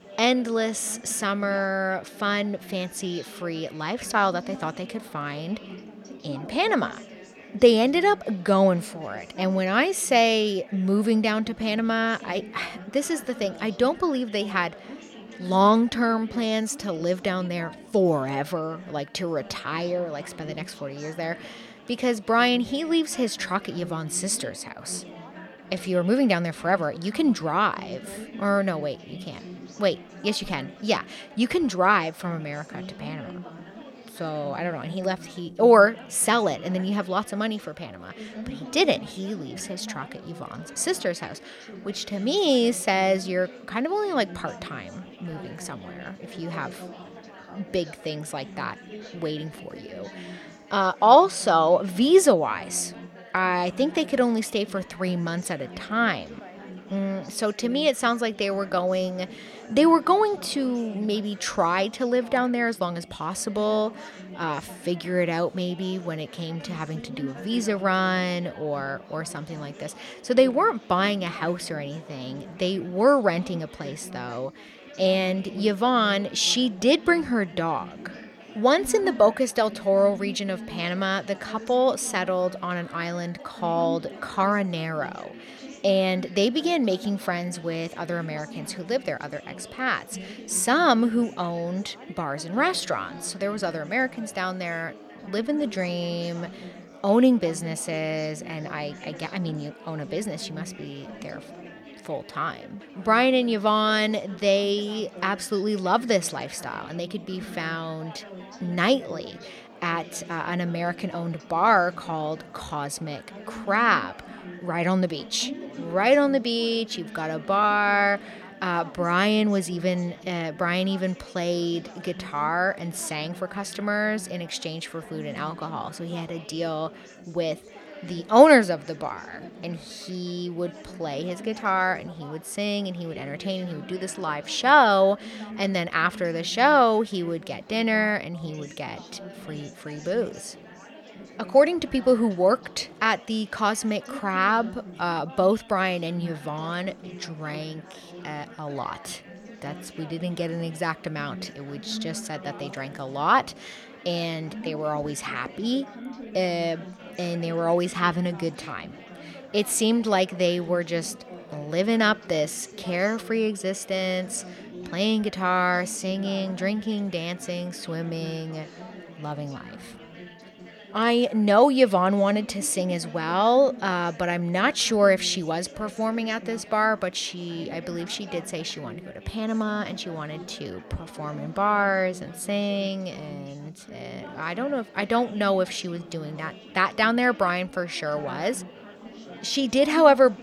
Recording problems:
chatter from many people; noticeable; throughout; 15 dB below the speech

